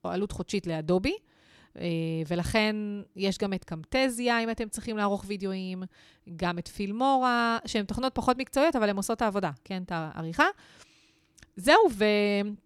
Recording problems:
none

